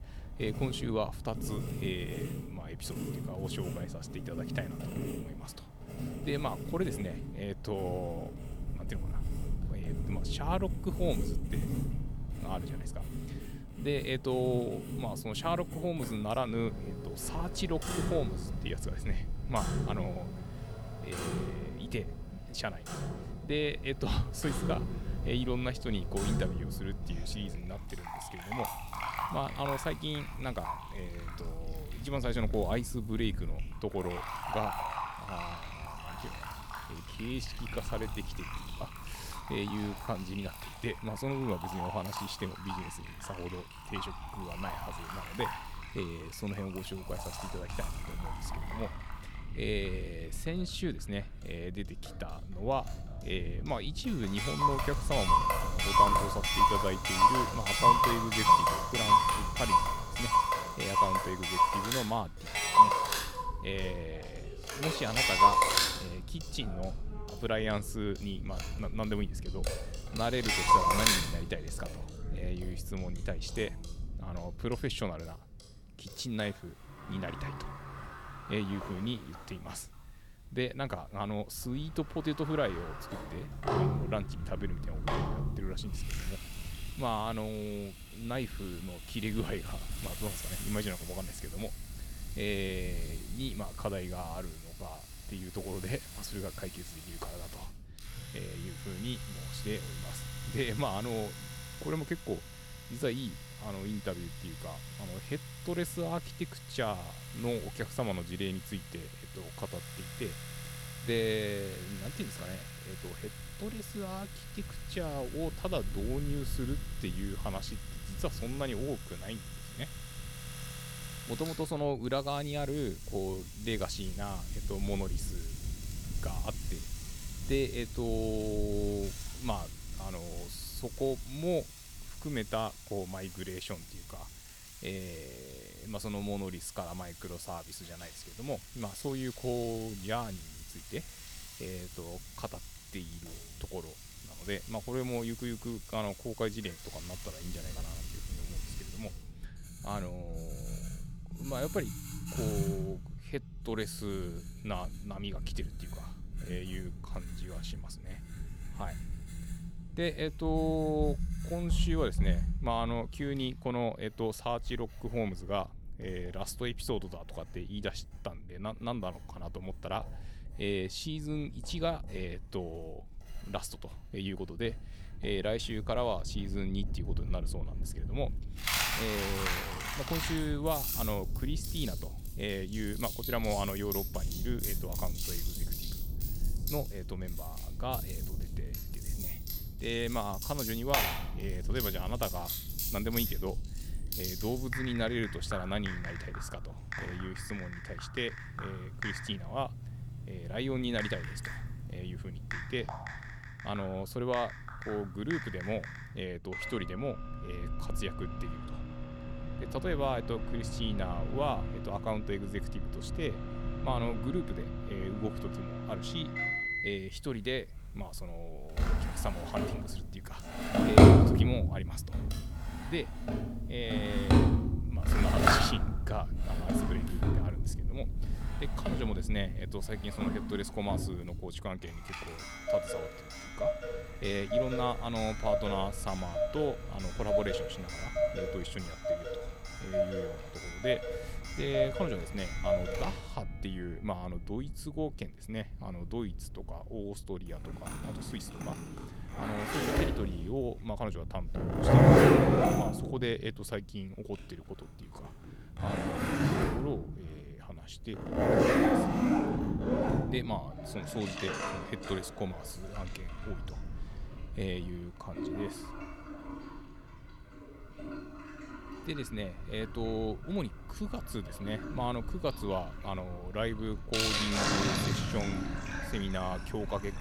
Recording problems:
household noises; very loud; throughout; 4 dB above the speech
low rumble; faint; throughout; 20 dB below the speech

